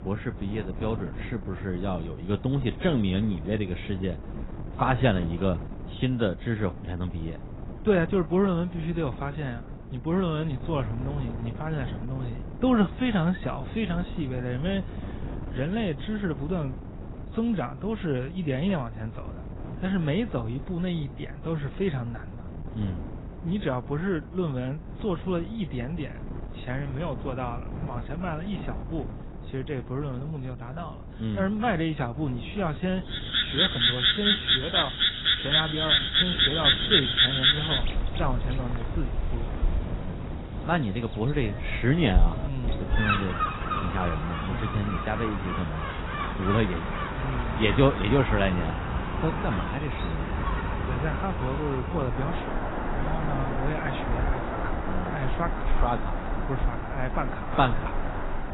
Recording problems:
garbled, watery; badly; nothing above 4 kHz
animal sounds; very loud; from 33 s on; 3 dB above the speech
wind noise on the microphone; occasional gusts; 15 dB below the speech

